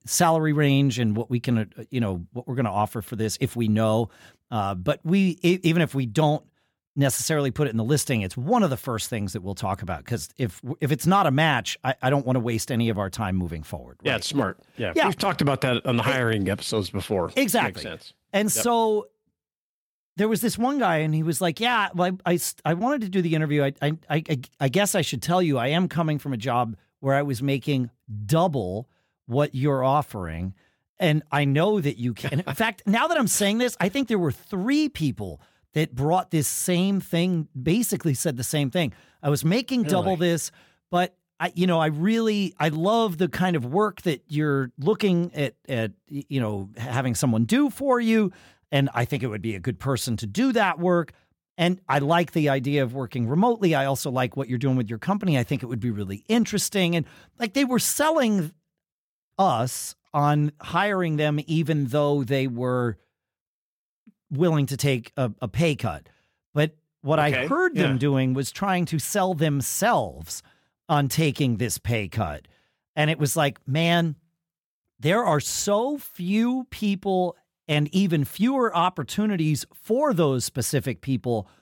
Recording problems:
none

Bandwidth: 17 kHz